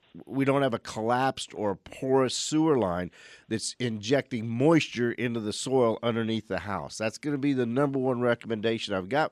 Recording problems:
none

